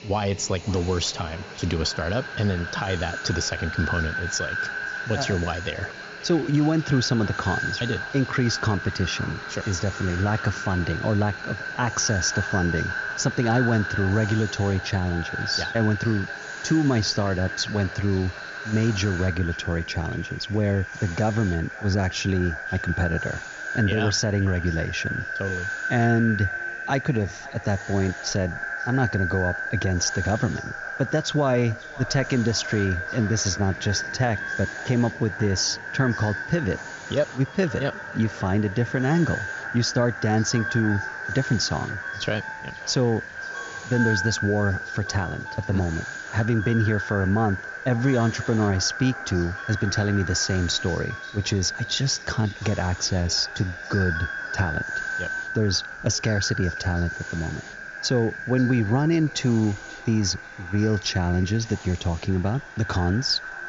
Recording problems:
echo of what is said; strong; throughout; 530 ms later, 7 dB below the speech
high frequencies cut off; noticeable; nothing above 7 kHz
train or aircraft noise; faint; throughout; 20 dB below the speech
hiss; faint; throughout; 25 dB below the speech

